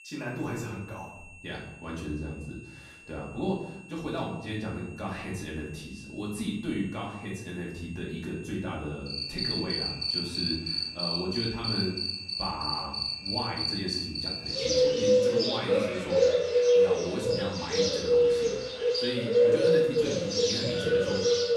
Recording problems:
off-mic speech; far
room echo; noticeable; dies away in 0.7 s
animal sounds; very loud; from 9 s on; 8 dB above the speech
high-pitched whine; noticeable; throughout; 2.5 kHz, 15 dB below the speech

